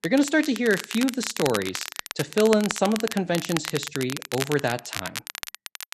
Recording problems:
crackle, like an old record; loud; 8 dB below the speech

